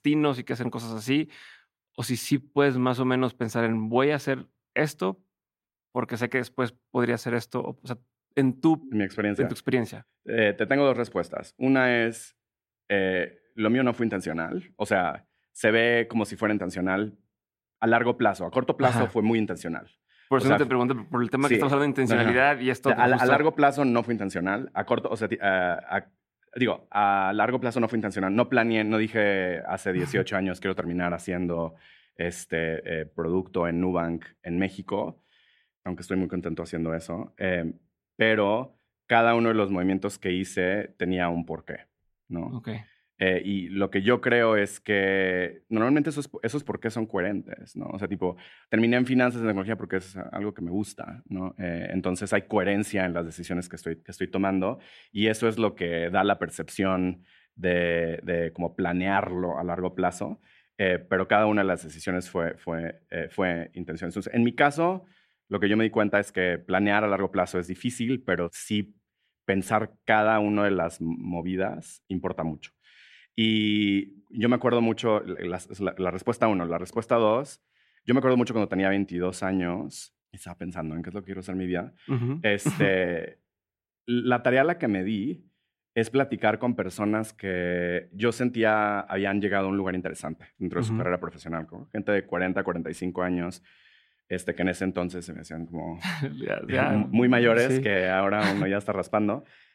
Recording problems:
none

